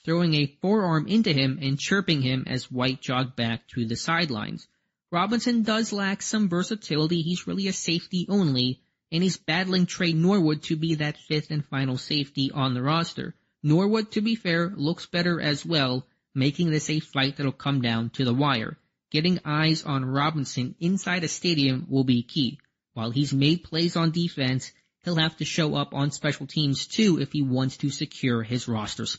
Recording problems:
garbled, watery; slightly; nothing above 7.5 kHz
high frequencies cut off; slight

